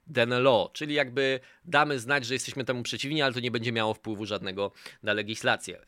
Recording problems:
none

